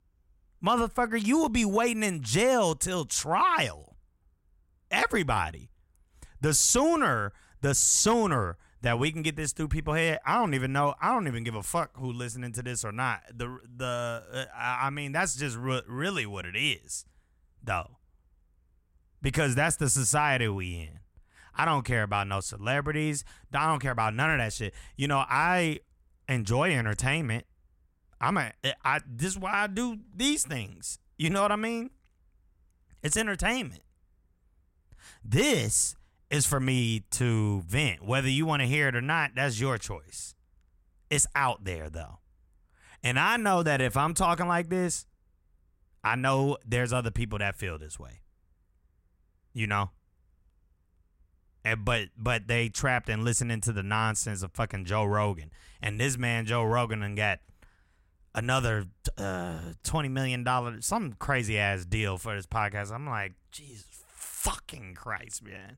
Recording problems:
none

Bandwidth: 16 kHz